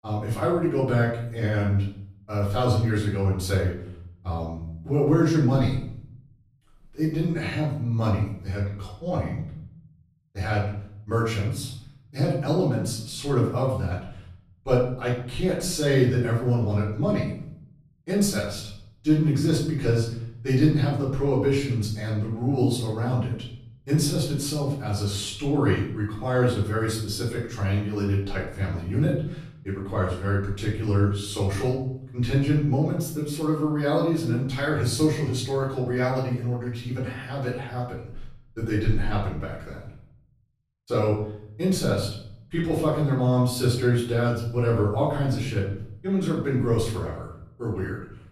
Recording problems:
off-mic speech; far
room echo; noticeable; dies away in 0.6 s

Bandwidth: 14.5 kHz